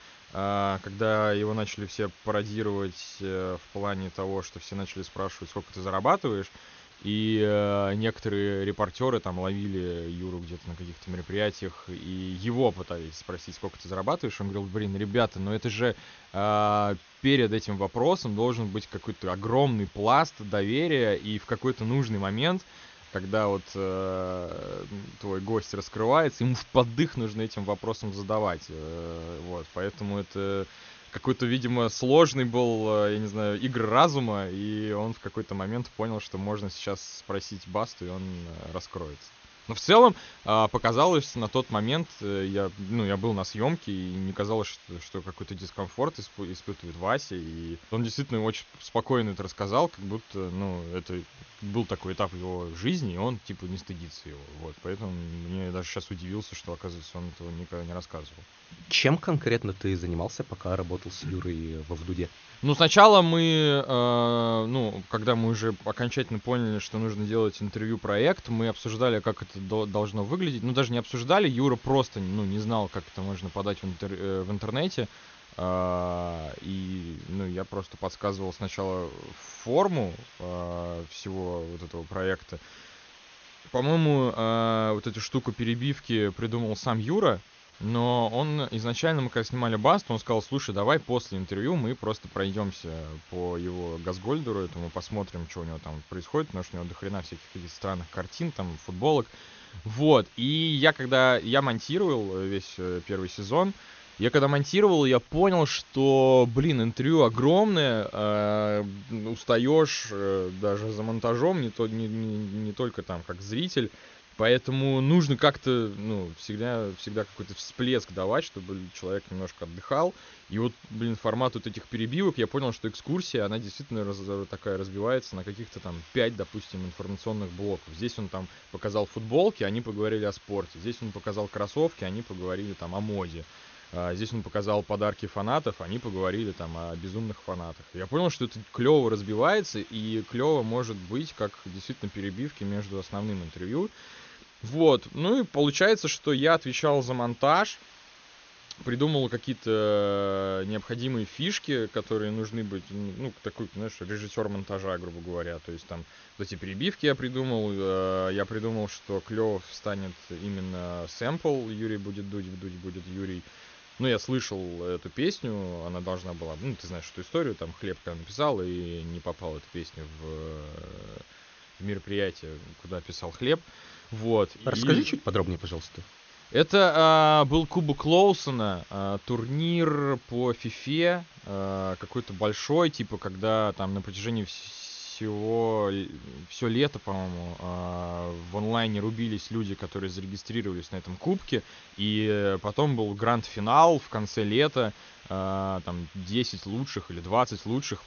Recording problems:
high frequencies cut off; noticeable; nothing above 6.5 kHz
hiss; faint; throughout; 25 dB below the speech

